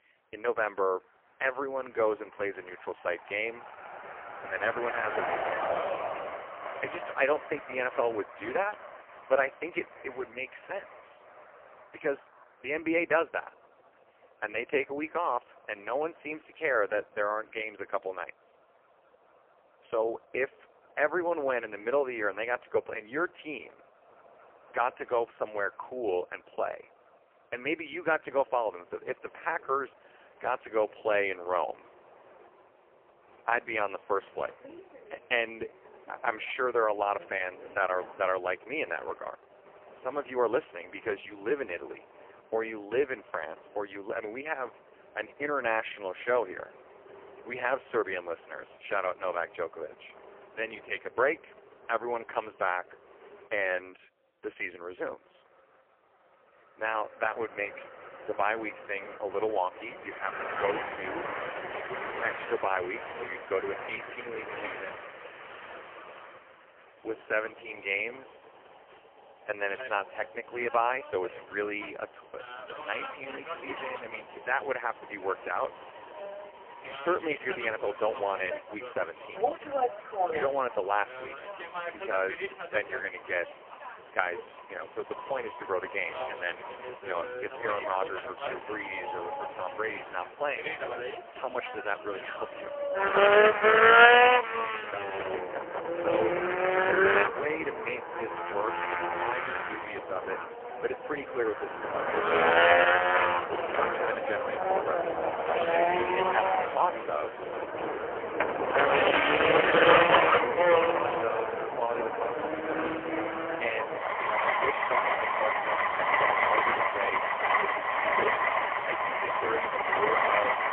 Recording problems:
phone-call audio; poor line
traffic noise; very loud; throughout; 5 dB above the speech

